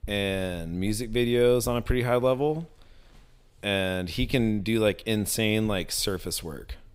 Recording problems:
none

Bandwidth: 15.5 kHz